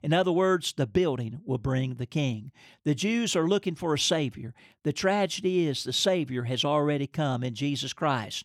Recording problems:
none

